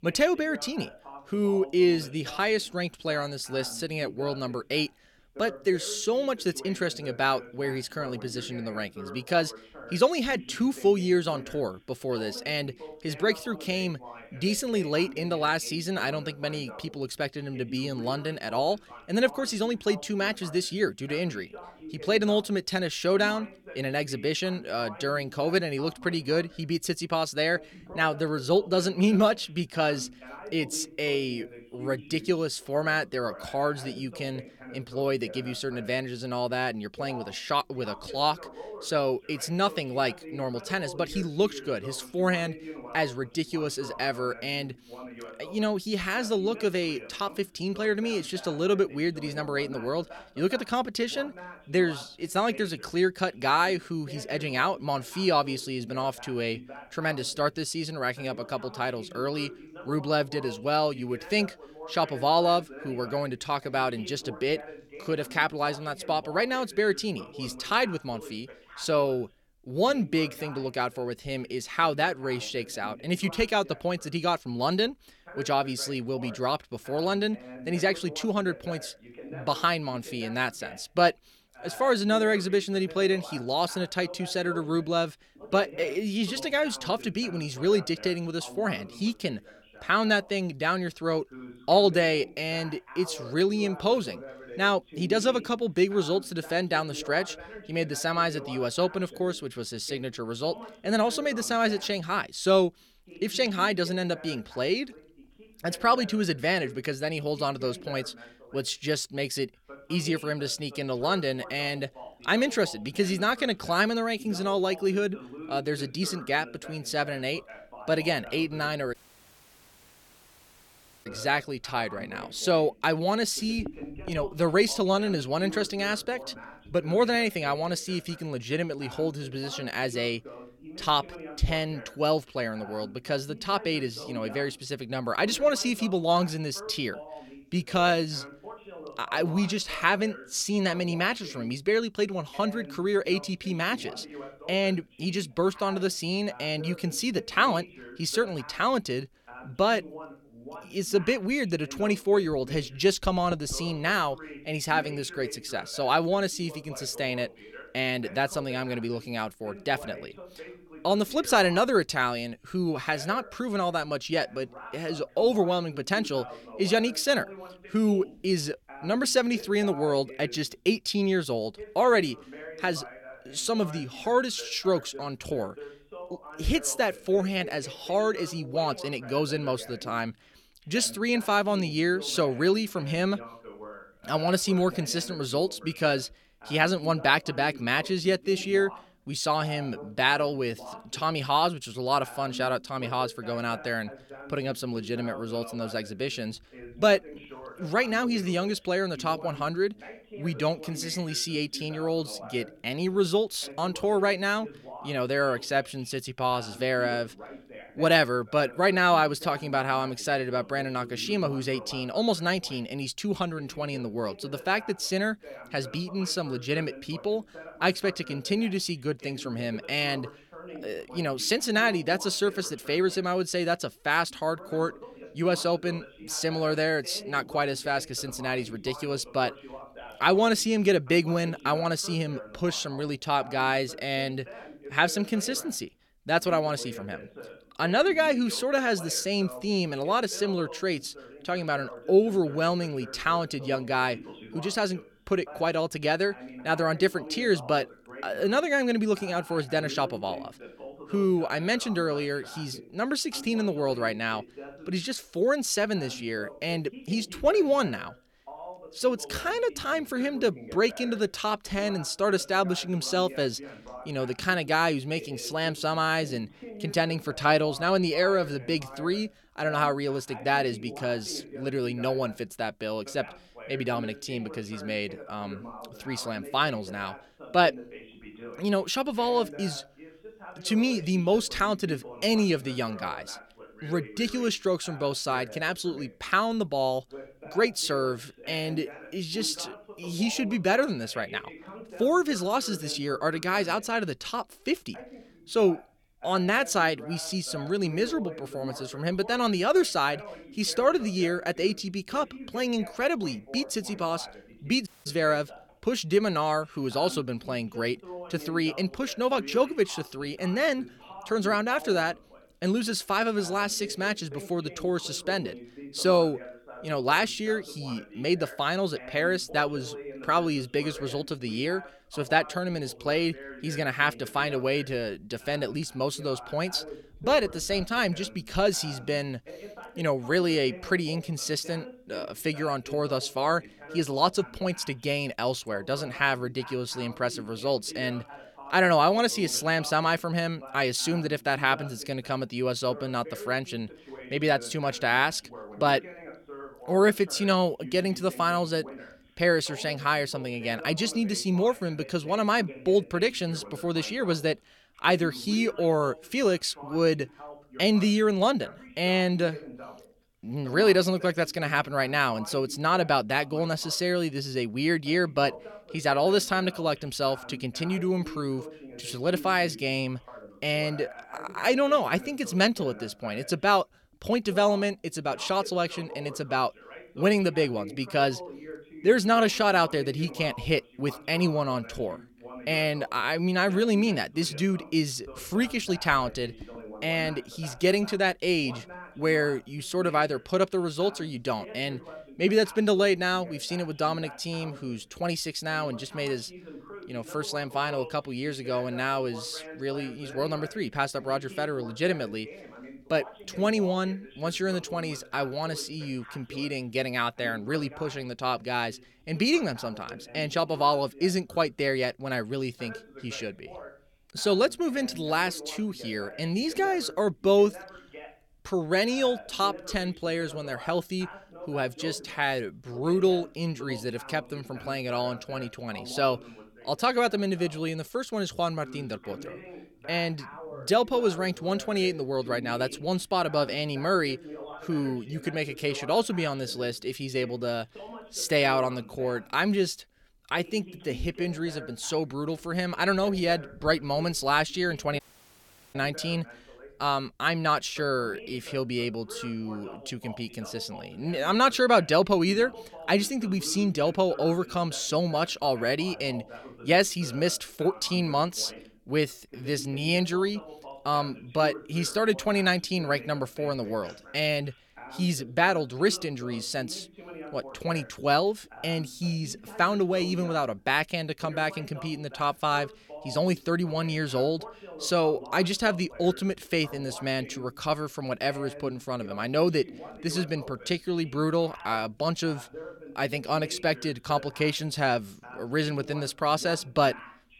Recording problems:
voice in the background; noticeable; throughout; 15 dB below the speech
audio cutting out; at 1:59 for 2 s, at 5:05 and at 7:25 for 1 s

